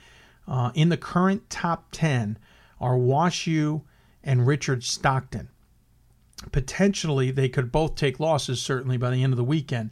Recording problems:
none

